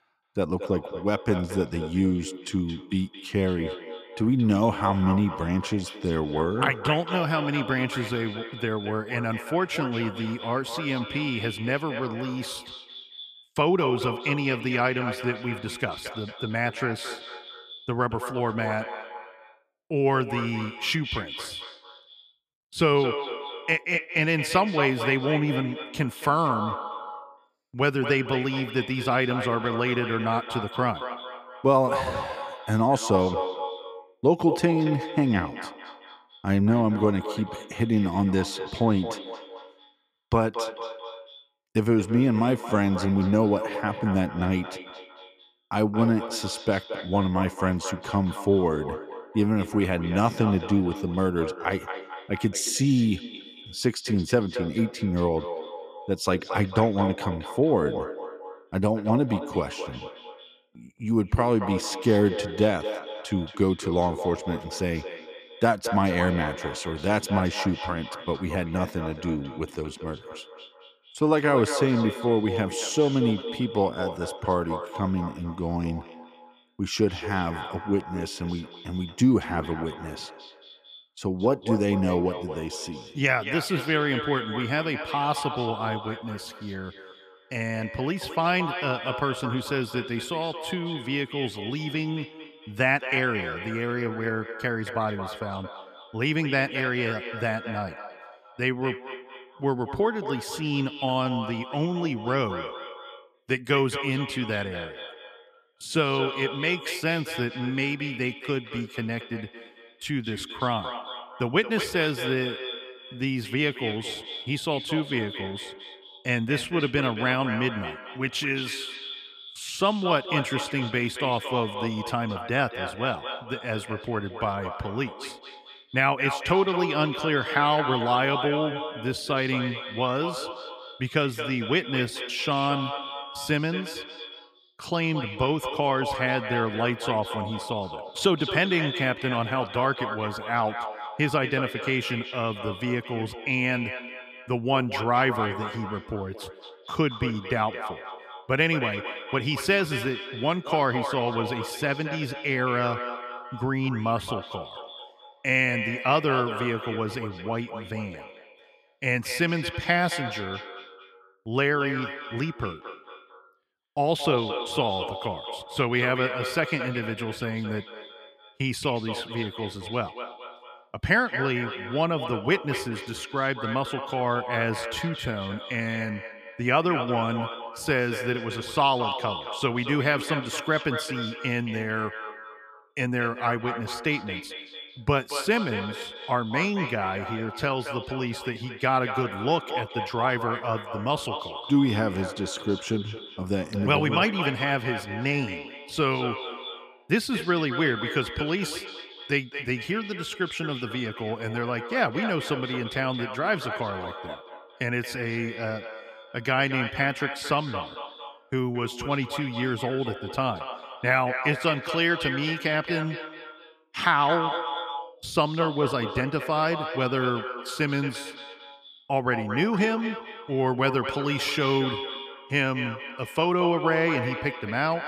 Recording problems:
echo of what is said; strong; throughout; 220 ms later, 8 dB below the speech

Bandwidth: 14.5 kHz